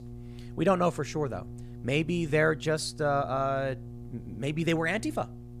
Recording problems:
electrical hum; faint; throughout; 60 Hz, 25 dB below the speech

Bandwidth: 15 kHz